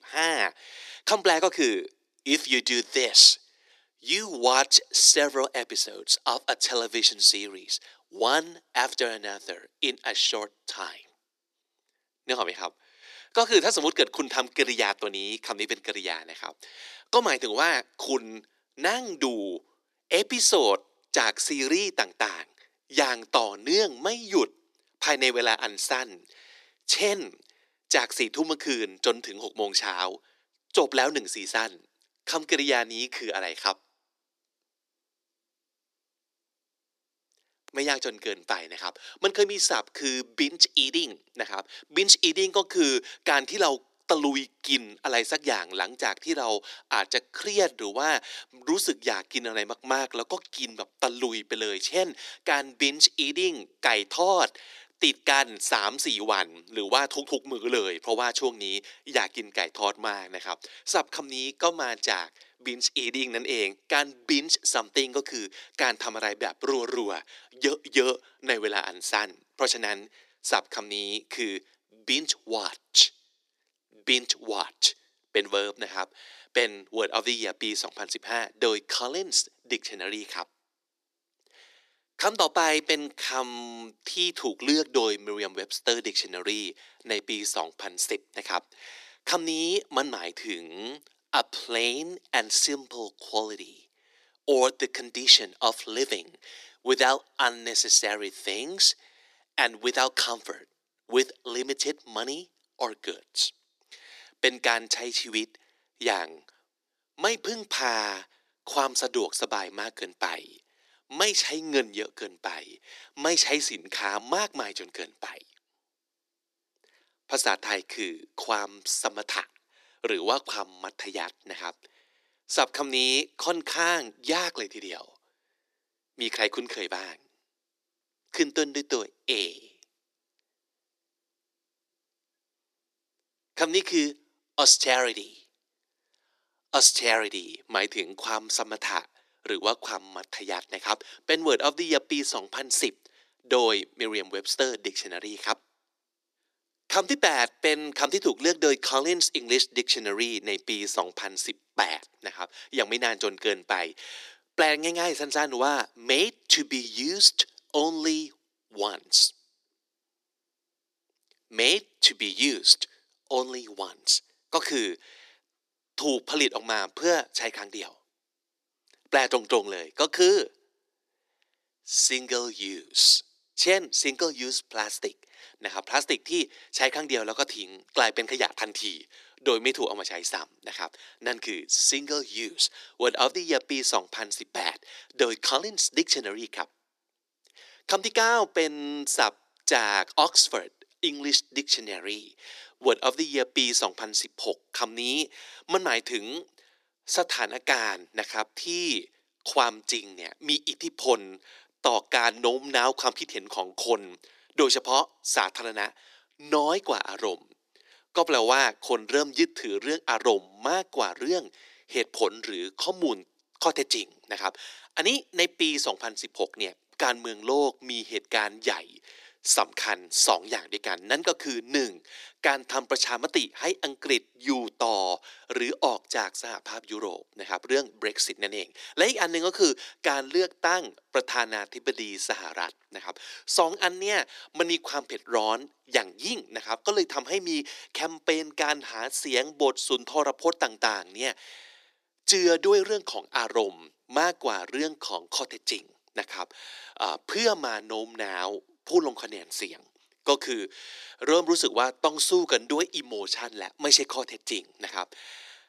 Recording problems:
thin; very; fading below 300 Hz

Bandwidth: 14 kHz